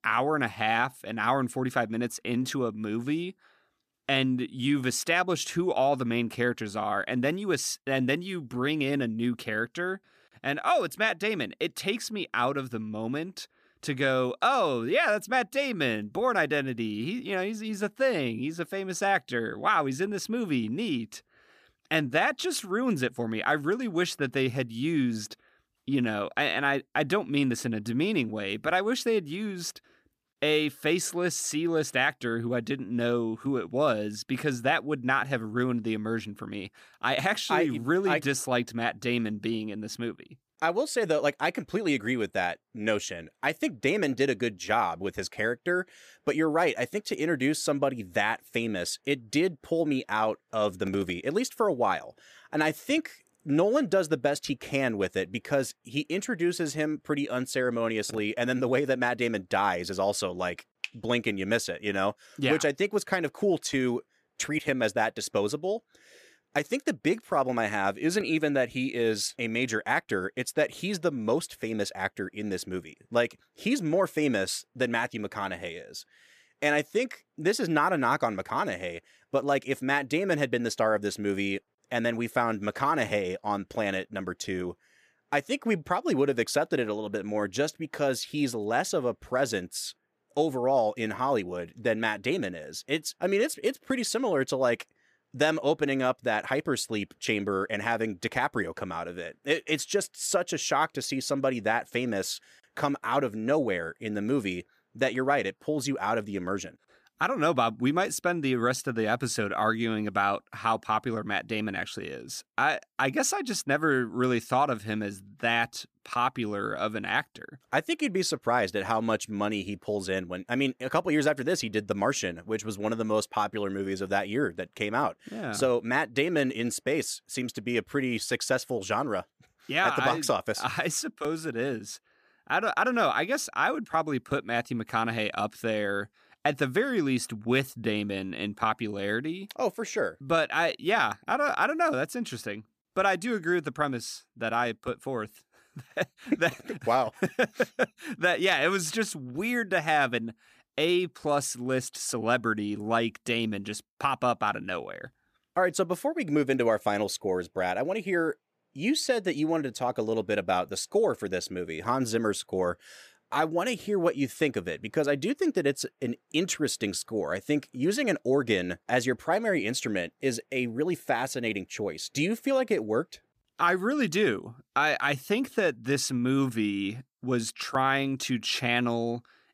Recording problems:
none

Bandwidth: 14.5 kHz